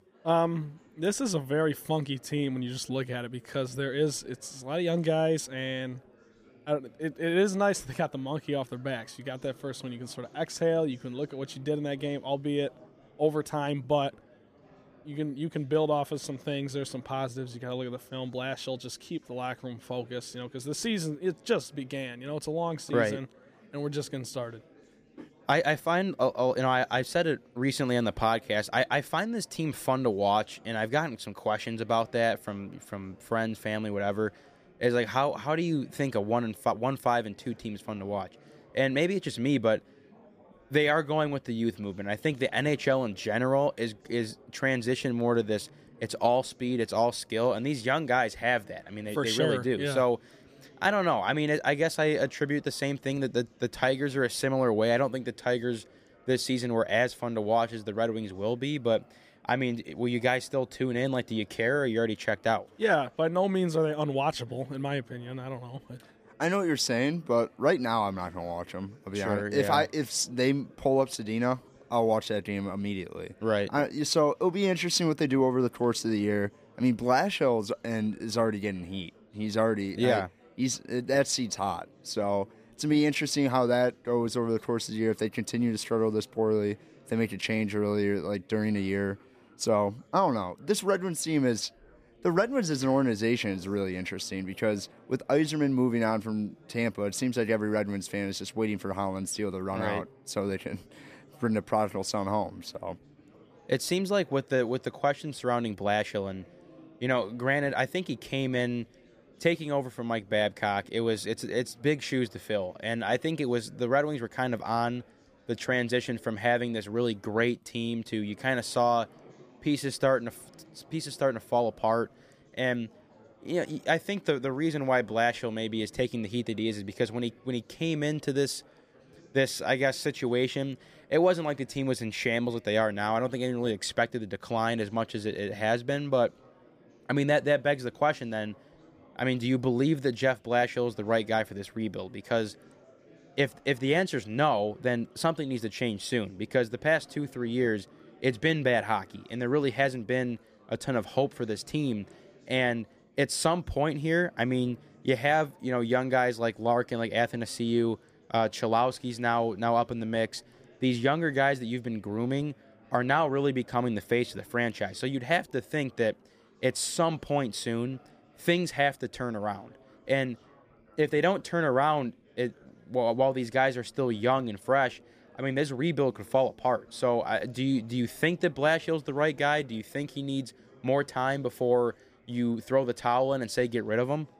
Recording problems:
chatter from many people; faint; throughout; 30 dB below the speech

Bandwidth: 15 kHz